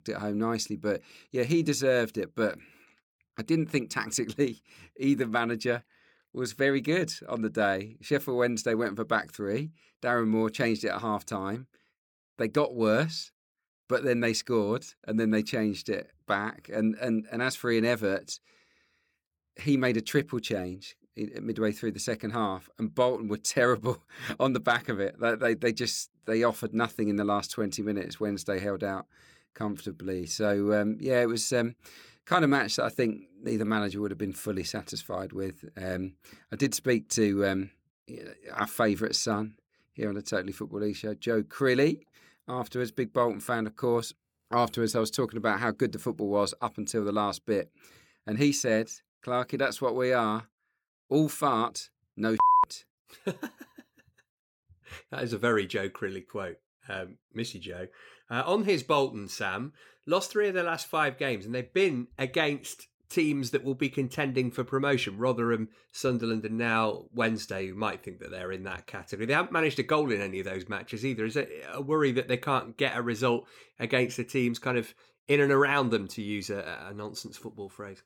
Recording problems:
none

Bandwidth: 18 kHz